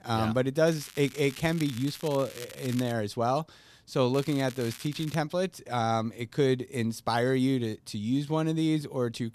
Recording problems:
crackling; noticeable; from 0.5 to 3 s, at 4 s and at 5 s; 15 dB below the speech

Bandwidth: 14 kHz